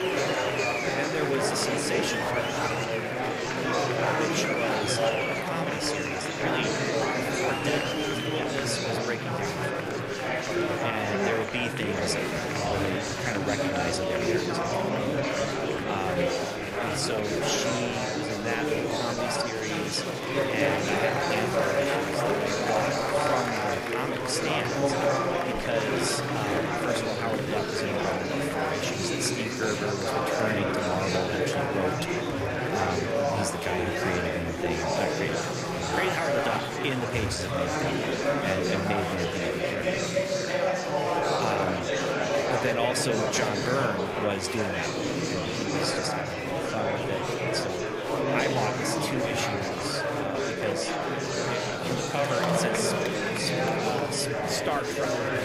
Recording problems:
murmuring crowd; very loud; throughout; 5 dB above the speech

